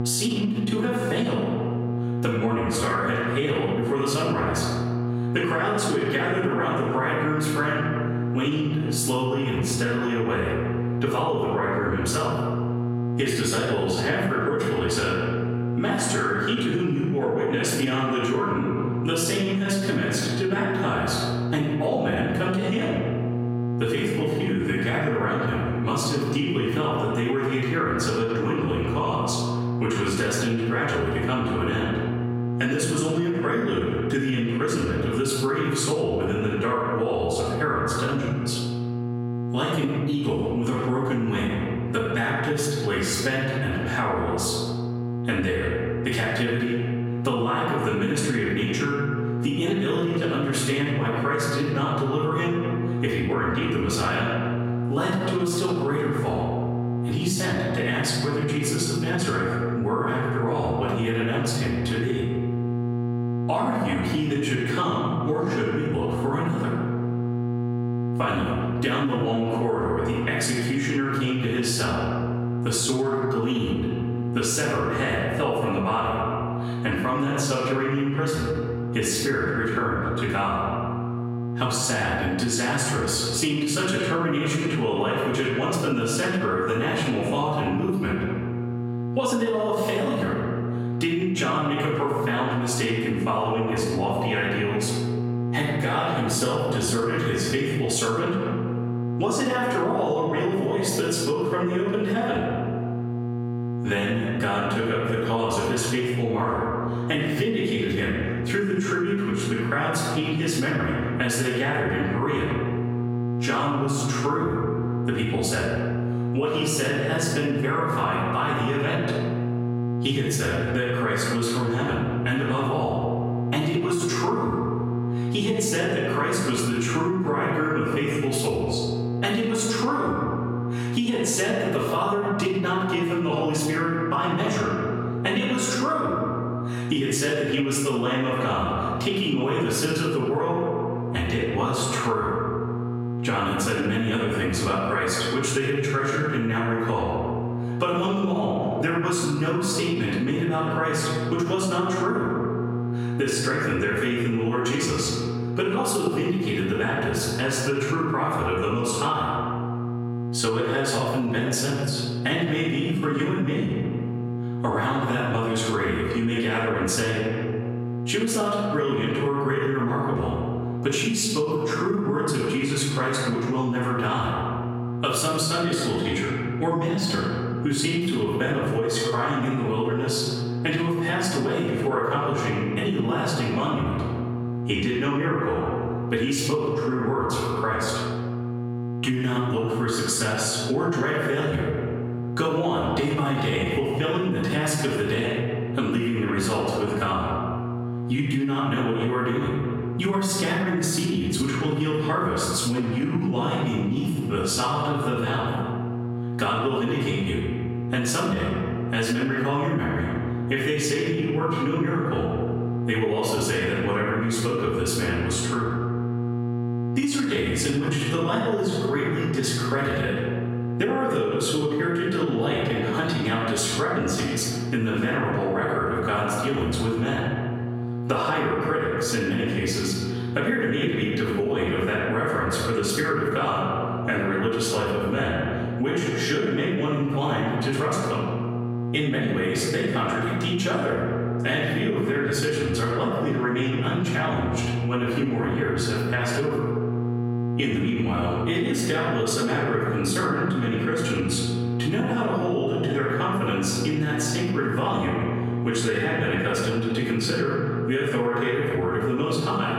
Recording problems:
off-mic speech; far
room echo; noticeable; dies away in 1.2 s
squashed, flat; somewhat
electrical hum; noticeable; throughout; 60 Hz, 15 dB below the speech

